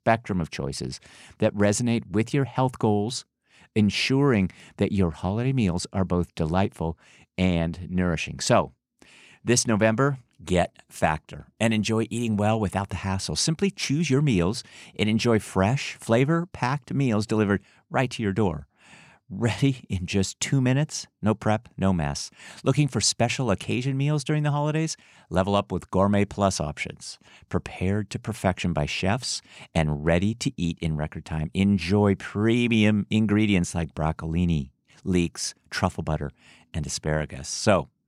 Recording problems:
none

